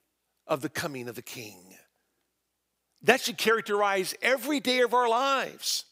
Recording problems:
none

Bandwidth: 15.5 kHz